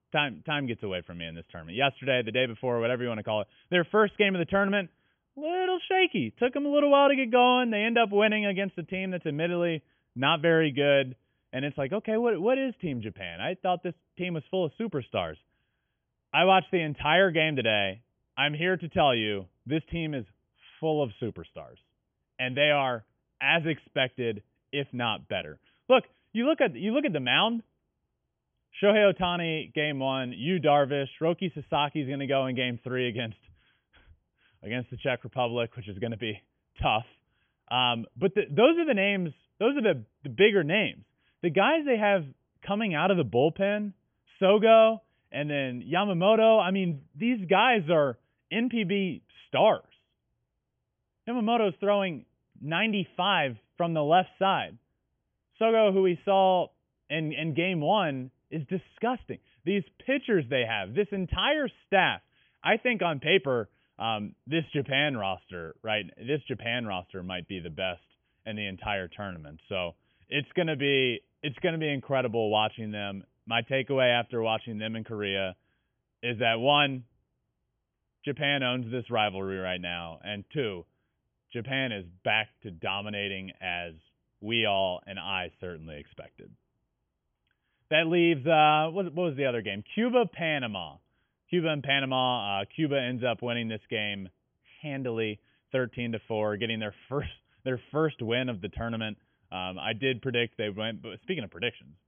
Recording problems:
high frequencies cut off; severe; nothing above 3.5 kHz

